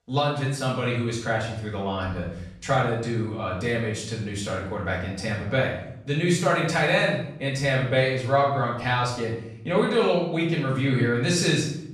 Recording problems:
off-mic speech; far
room echo; noticeable; dies away in 0.7 s

